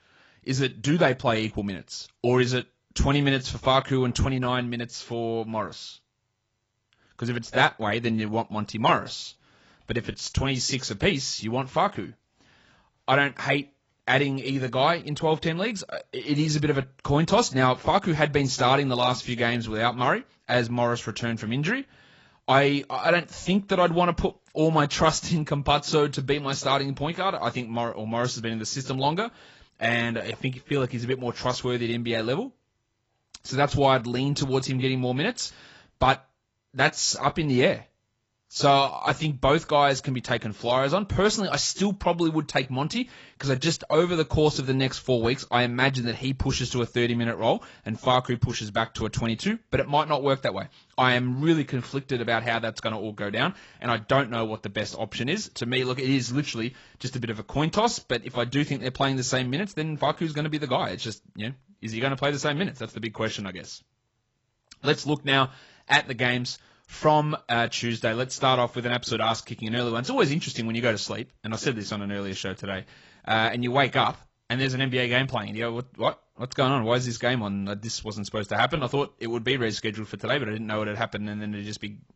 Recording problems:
garbled, watery; badly; nothing above 7.5 kHz

